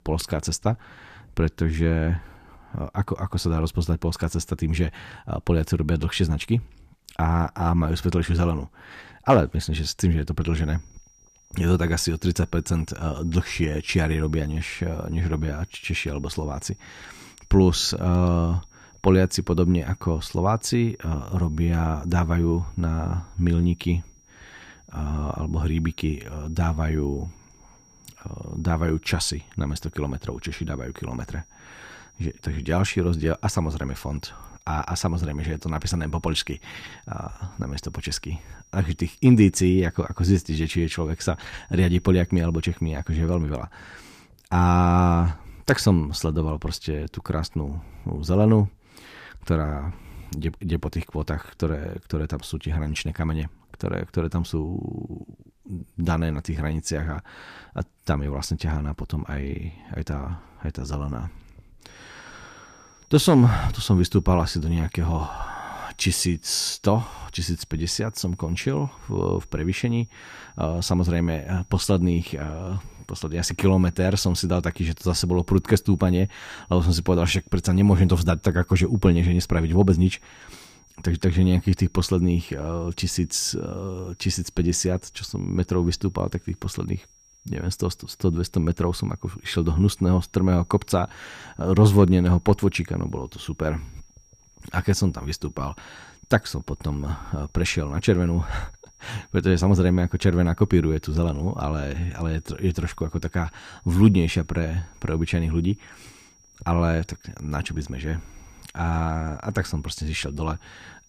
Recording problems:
high-pitched whine; faint; from 10 to 43 s and from 1:02 on; 5.5 kHz, 30 dB below the speech

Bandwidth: 14.5 kHz